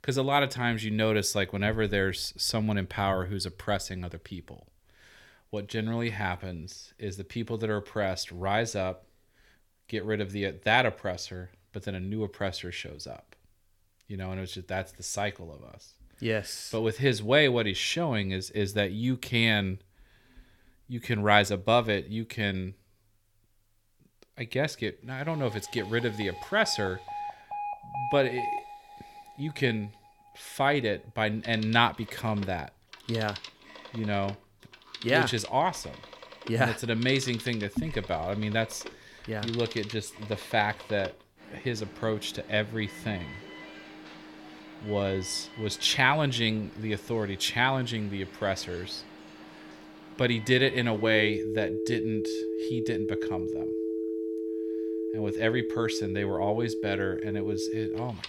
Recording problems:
alarms or sirens; loud; from 26 s on; 8 dB below the speech

